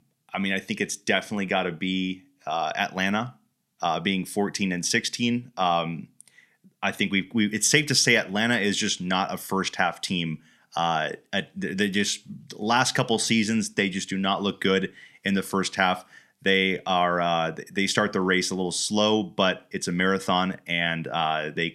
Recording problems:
none

